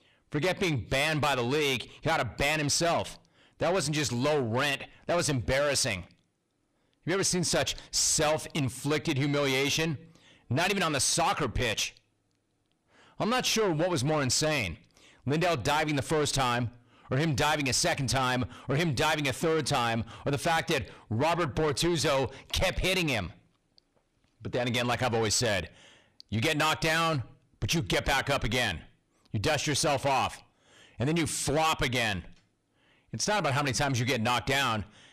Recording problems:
distortion; heavy; 6 dB below the speech

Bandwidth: 14.5 kHz